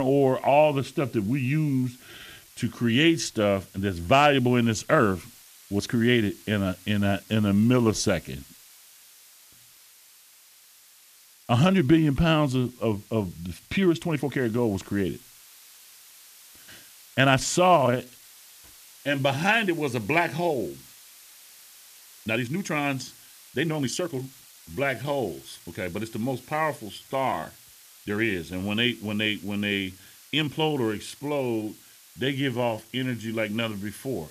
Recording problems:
hiss; faint; throughout; 25 dB below the speech
abrupt cut into speech; at the start
uneven, jittery; strongly; from 2 to 33 s

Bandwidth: 14.5 kHz